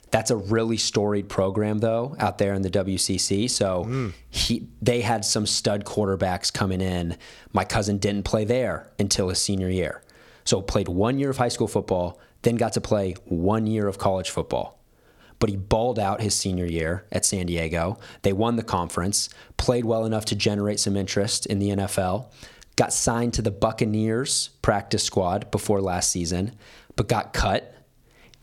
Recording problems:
squashed, flat; somewhat

